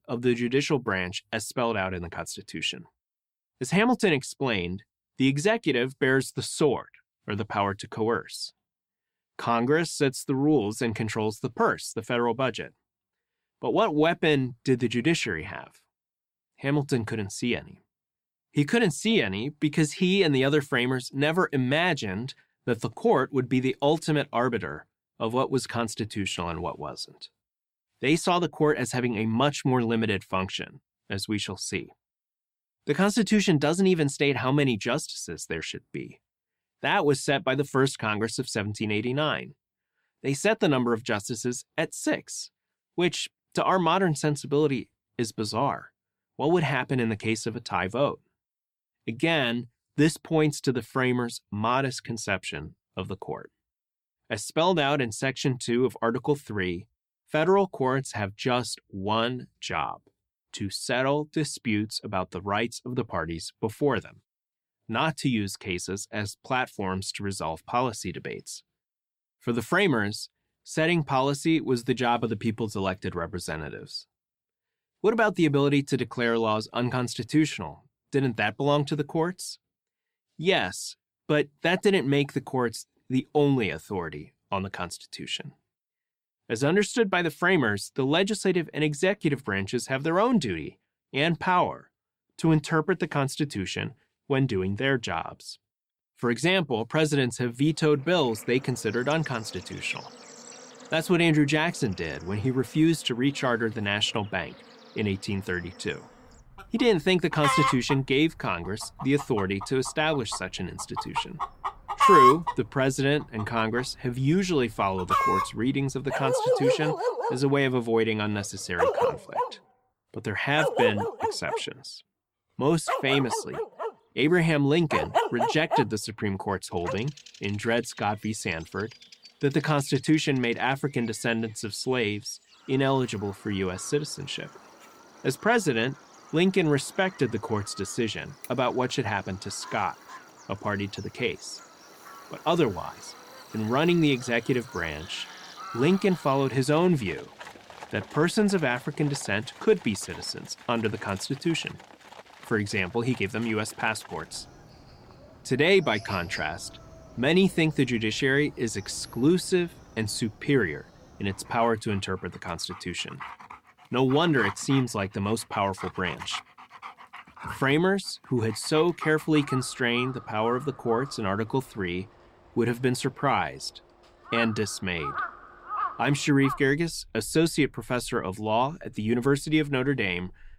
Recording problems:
animal sounds; loud; from 1:38 on; 4 dB below the speech

